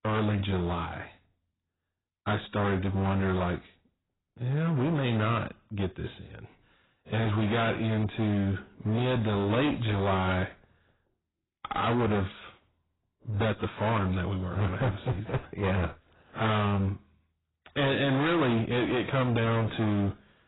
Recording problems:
distortion; heavy; 23% of the sound clipped
garbled, watery; badly; nothing above 4 kHz

